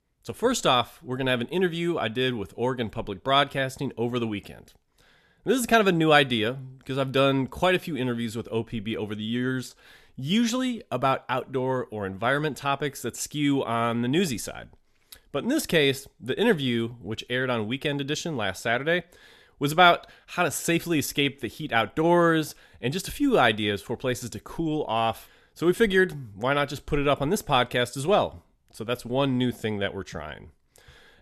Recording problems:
none

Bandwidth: 13.5 kHz